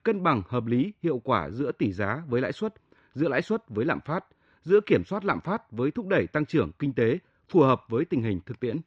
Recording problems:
muffled; slightly; fading above 3 kHz

